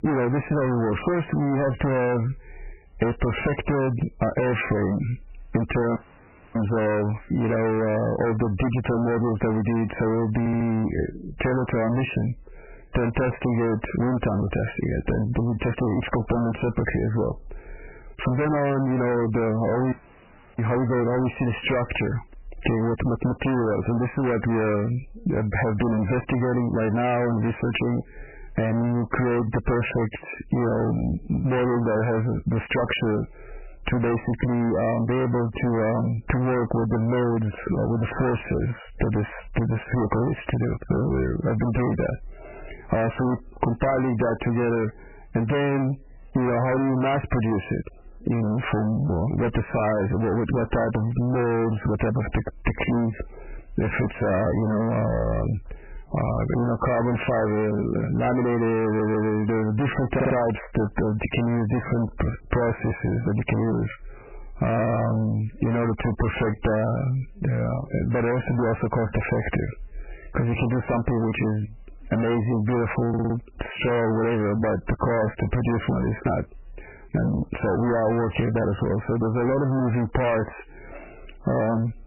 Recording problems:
distortion; heavy; 27% of the sound clipped
garbled, watery; badly; nothing above 3 kHz
squashed, flat; somewhat
audio cutting out; at 6 s for 0.5 s and at 20 s for 0.5 s
audio stuttering; 4 times, first at 10 s

